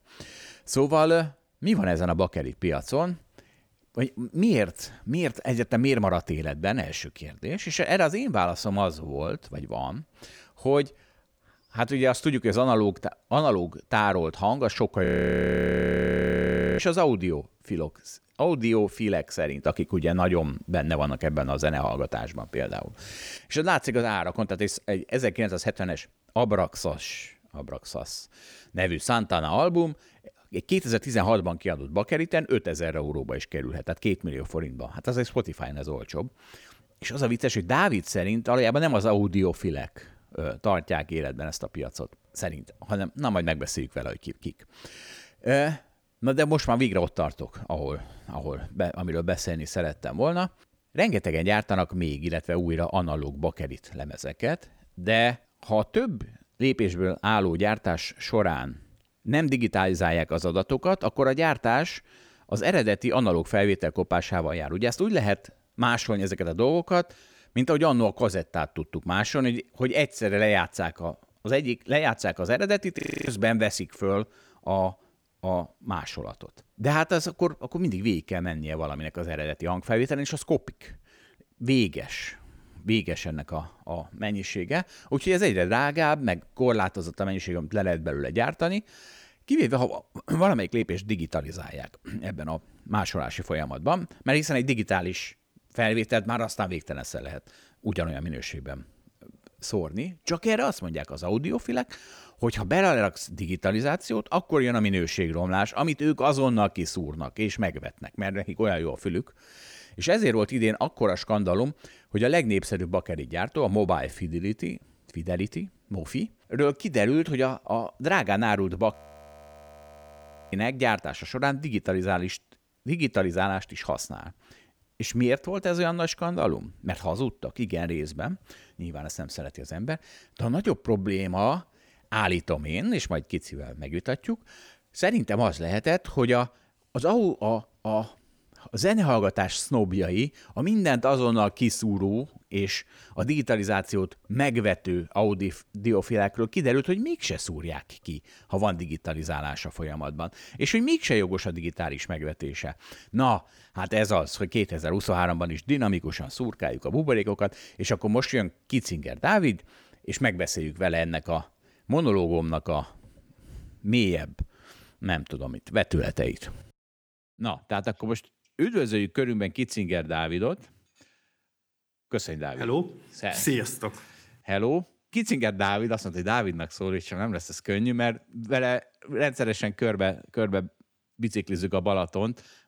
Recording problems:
audio freezing; at 15 s for 1.5 s, at 1:13 and at 1:59 for 1.5 s

